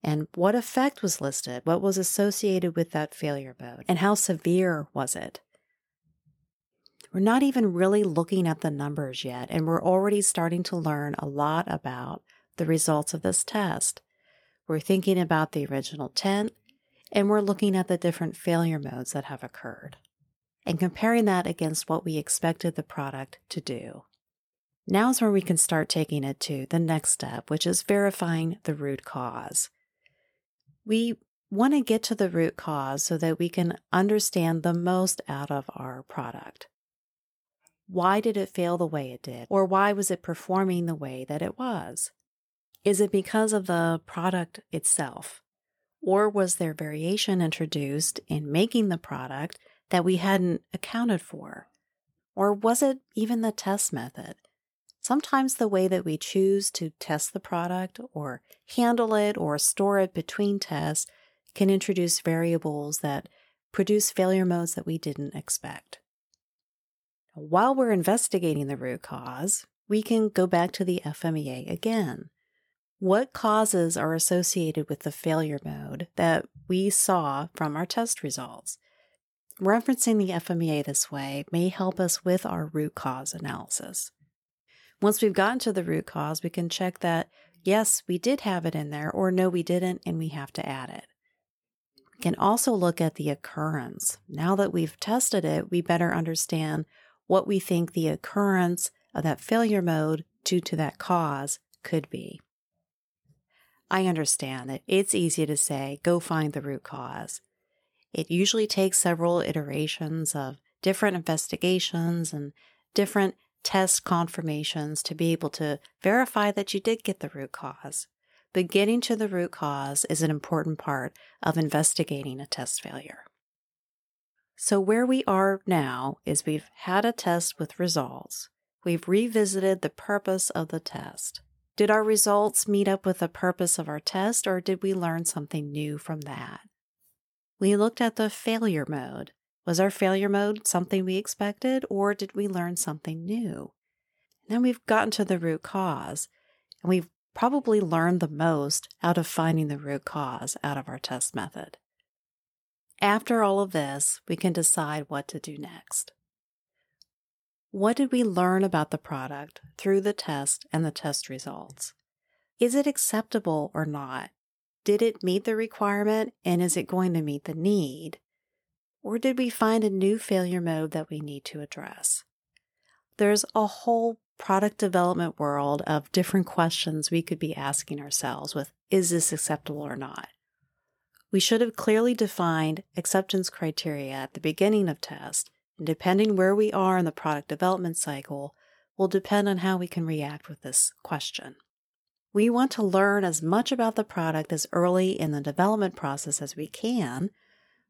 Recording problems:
none

